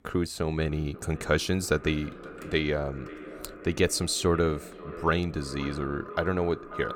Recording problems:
echo of what is said; noticeable; throughout; 540 ms later, 15 dB below the speech

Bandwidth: 17 kHz